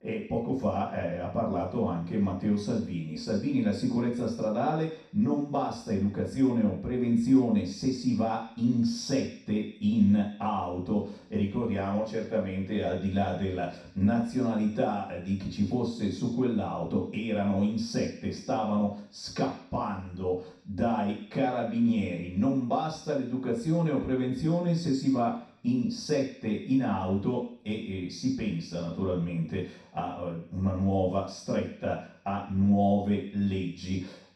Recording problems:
off-mic speech; far
room echo; noticeable; dies away in 0.6 s

